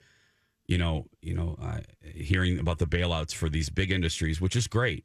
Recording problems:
none

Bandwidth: 14.5 kHz